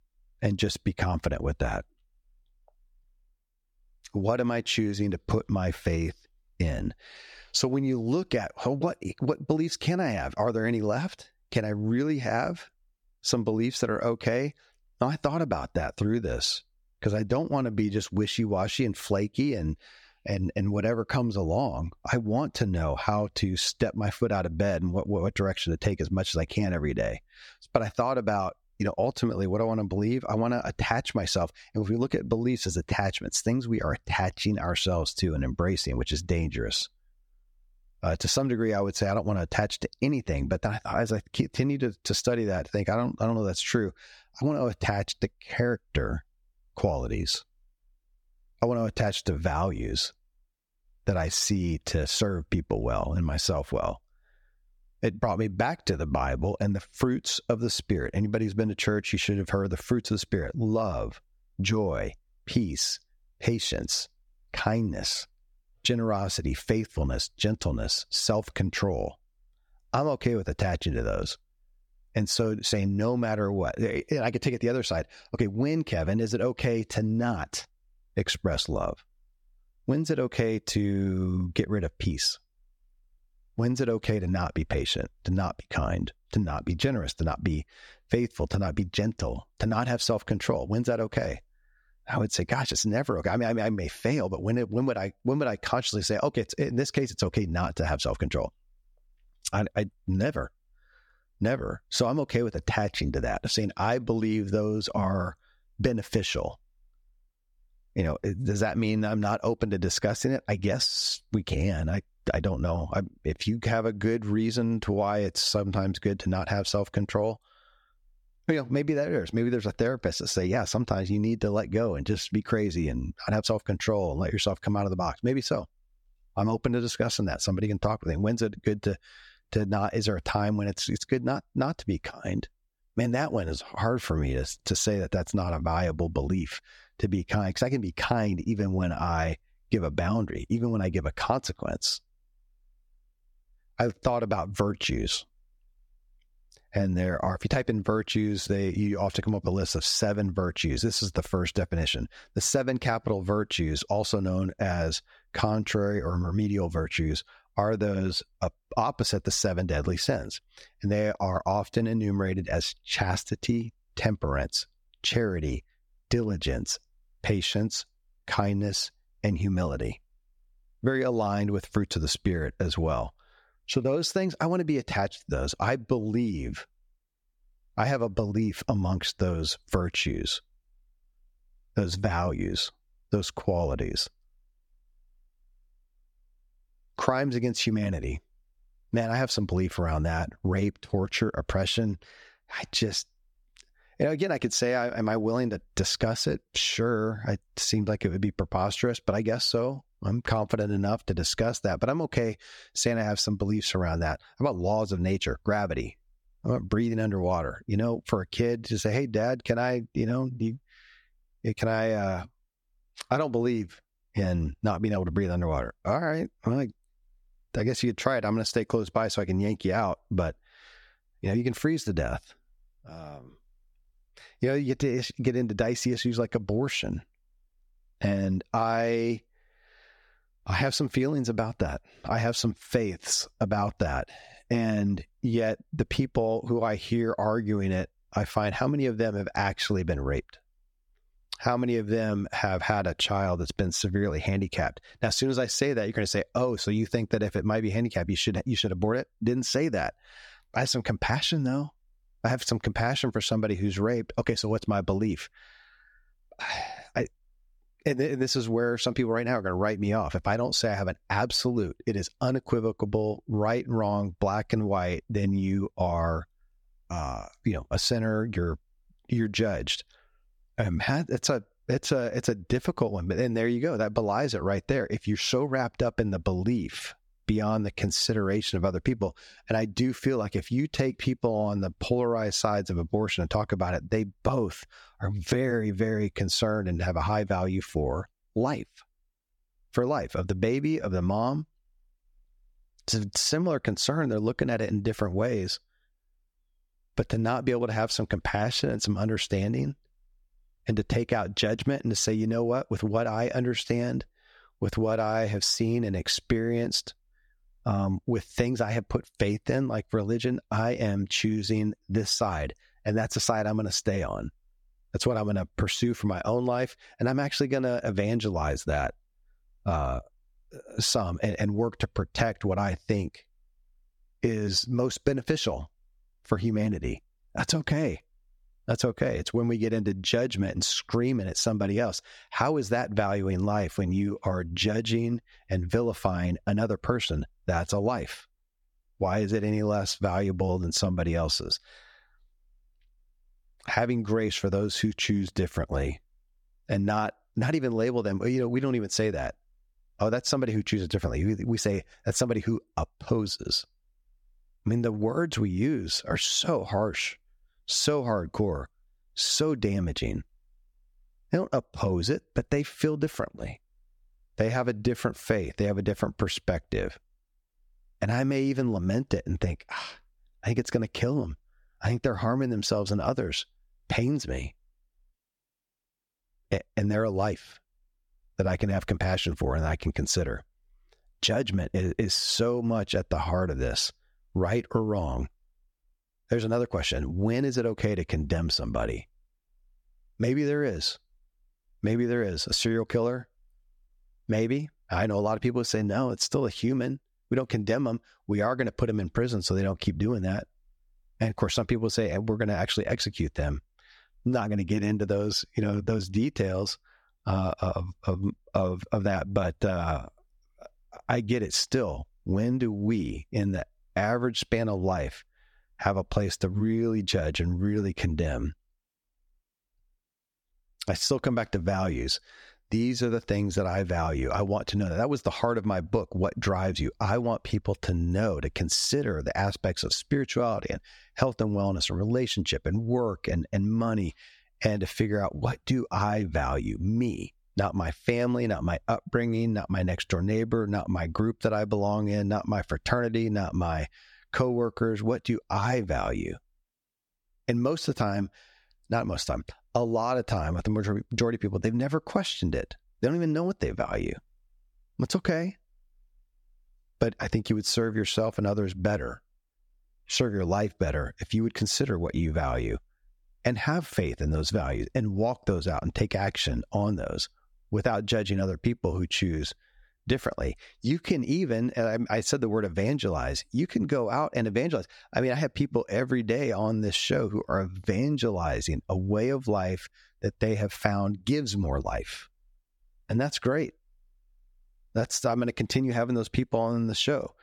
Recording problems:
squashed, flat; somewhat

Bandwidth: 18 kHz